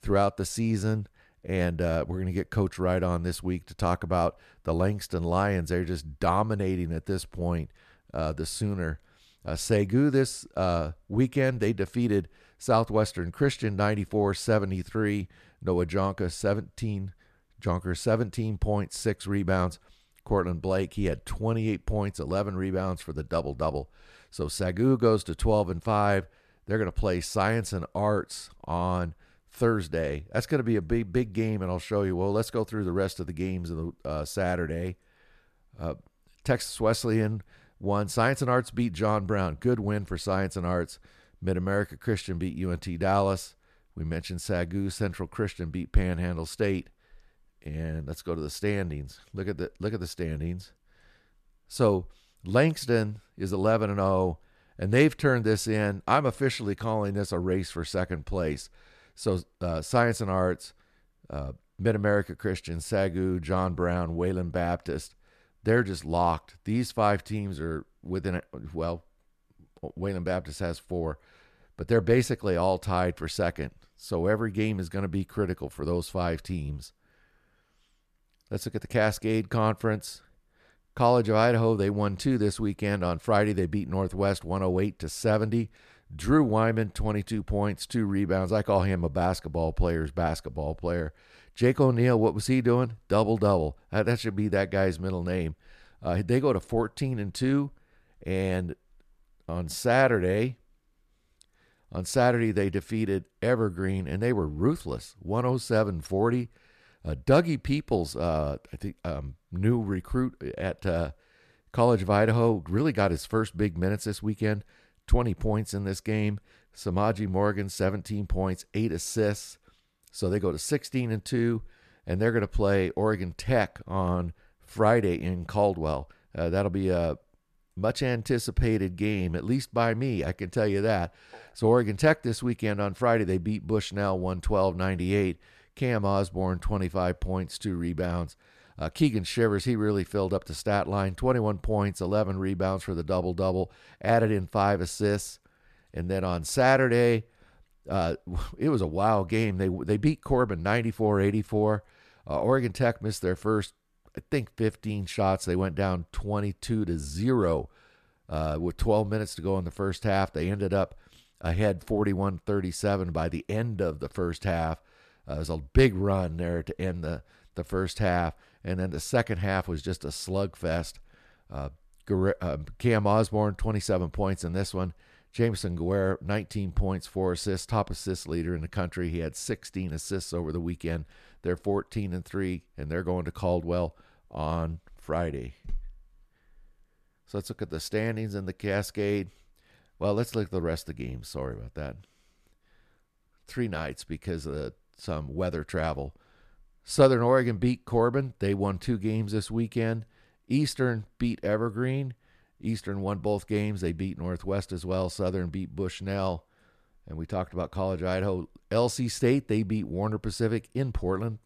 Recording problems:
none

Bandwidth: 14.5 kHz